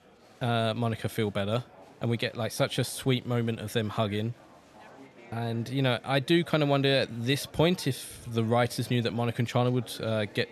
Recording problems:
murmuring crowd; faint; throughout; 25 dB below the speech

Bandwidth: 13.5 kHz